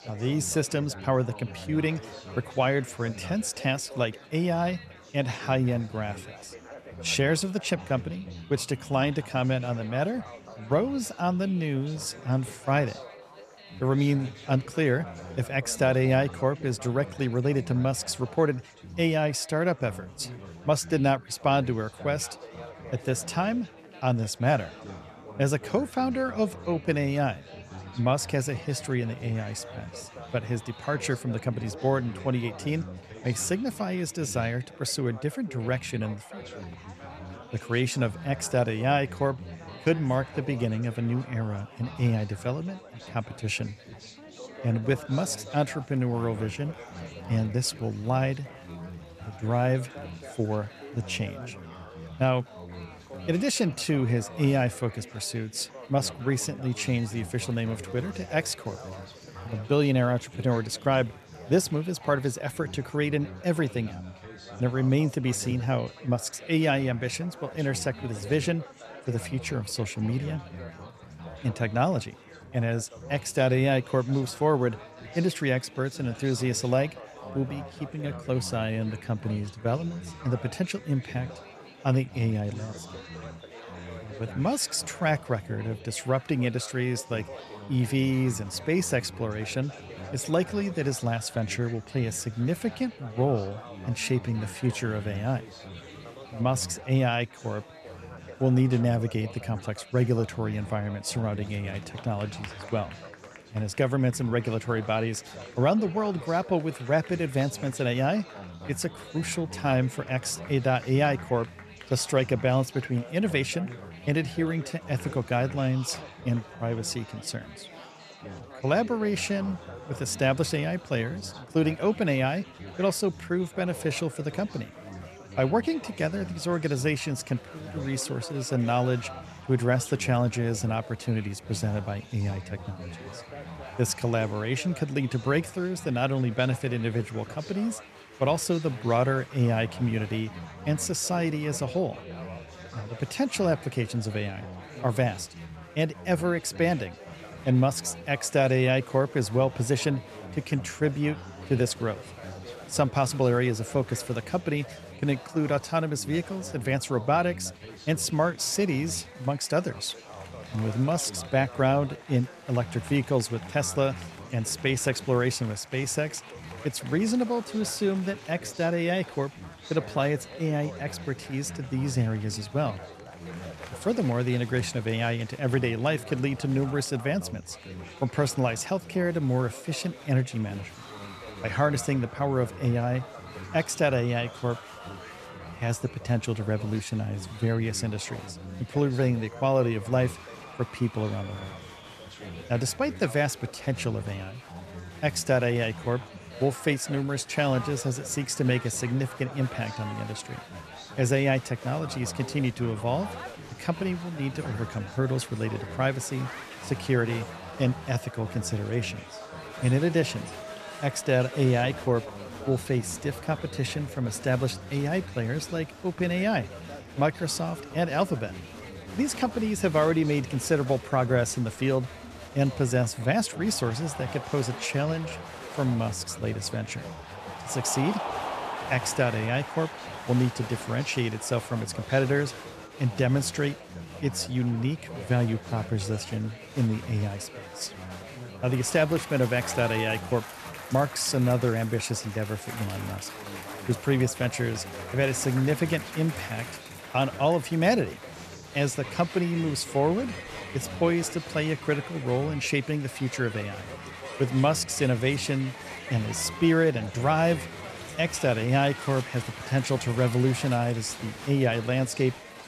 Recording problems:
chatter from many people; noticeable; throughout; 15 dB below the speech

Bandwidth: 14 kHz